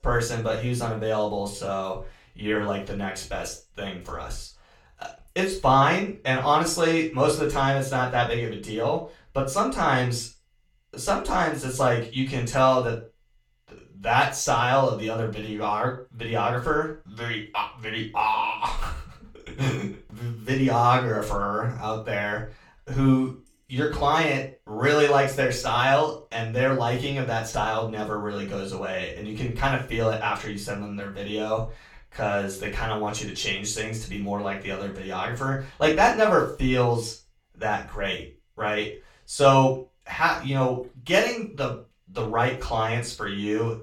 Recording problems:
off-mic speech; far
room echo; slight; dies away in 0.3 s

